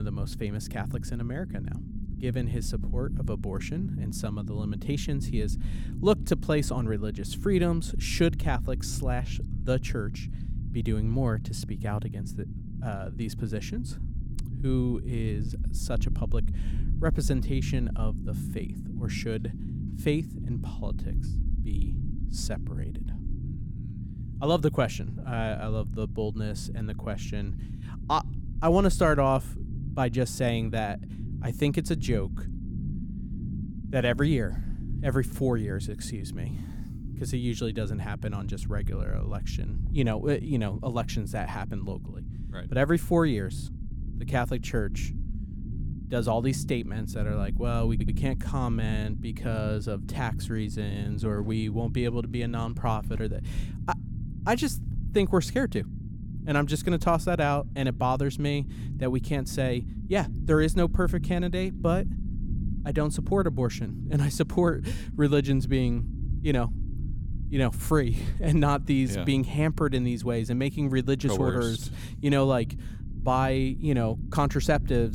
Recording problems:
low rumble; noticeable; throughout; 15 dB below the speech
abrupt cut into speech; at the start and the end
audio stuttering; at 48 s

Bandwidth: 17 kHz